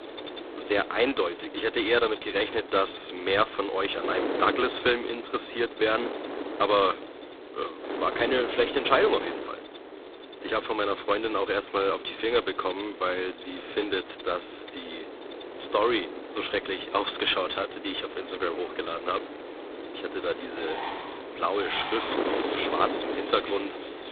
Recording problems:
phone-call audio; poor line; nothing above 3.5 kHz
thin; very; fading below 300 Hz
animal sounds; noticeable; throughout; 15 dB below the speech
wind noise on the microphone; occasional gusts; 10 dB below the speech

